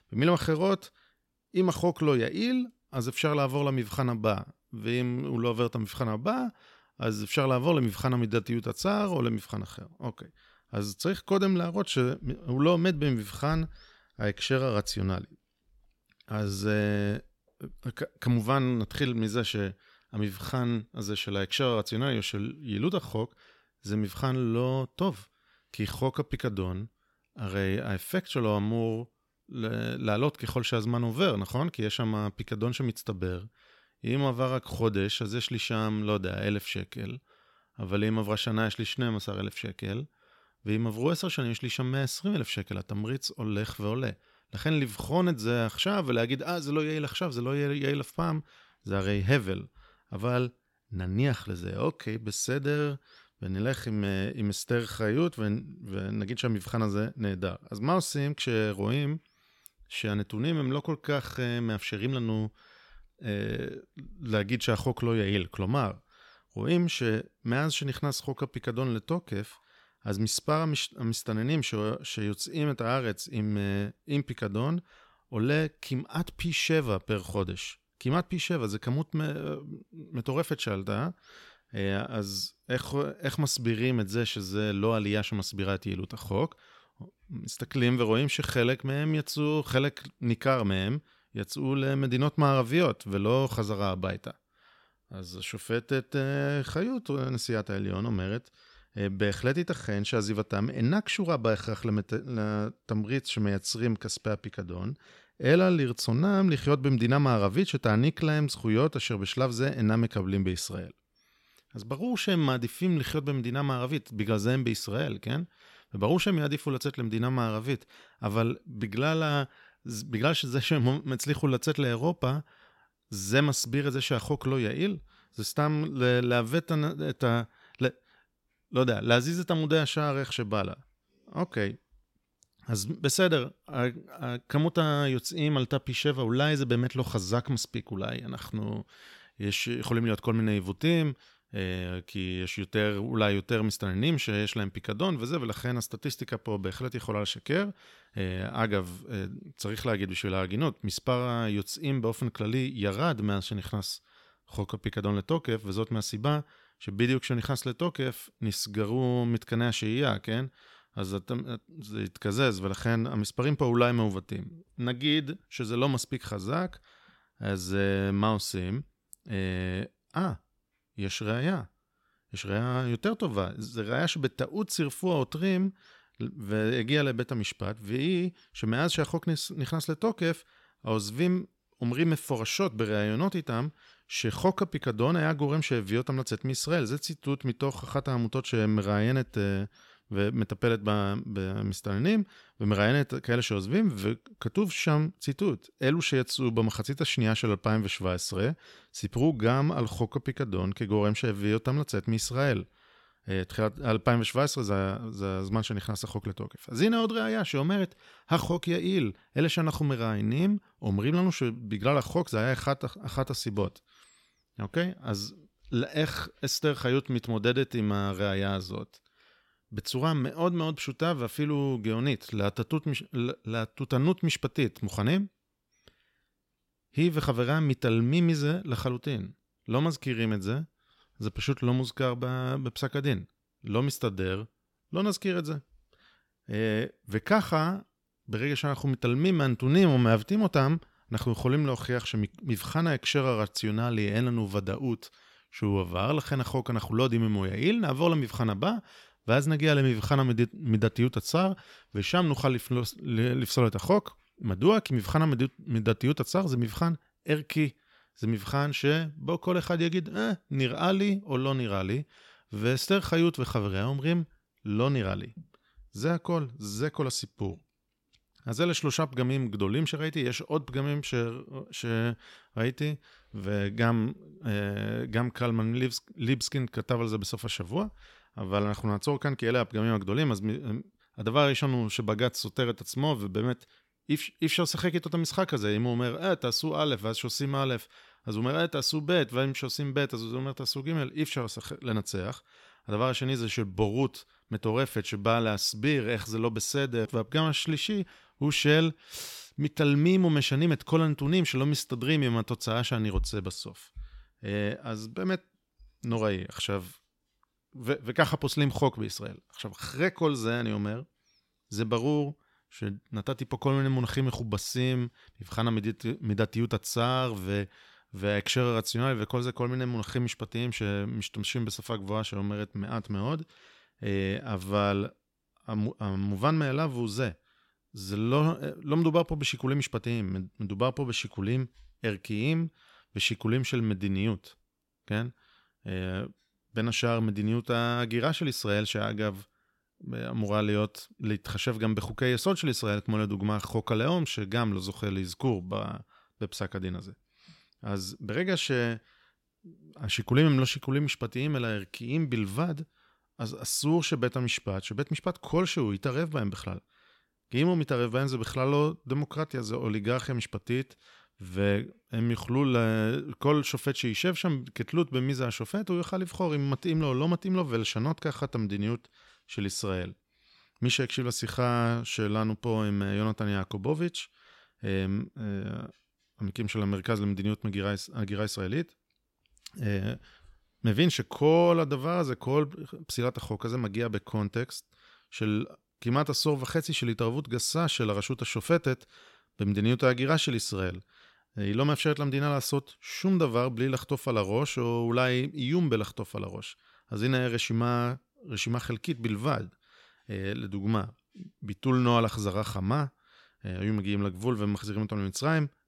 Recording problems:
none

